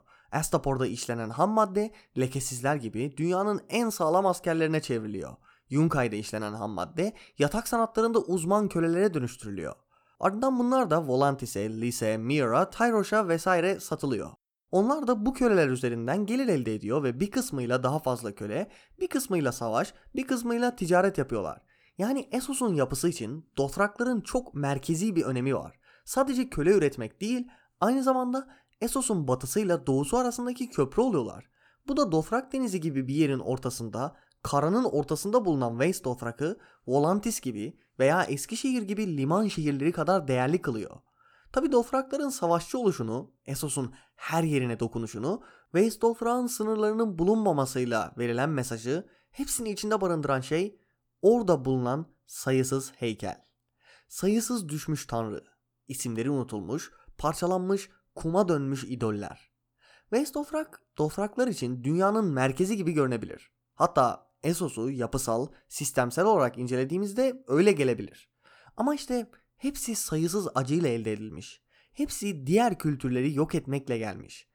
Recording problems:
none

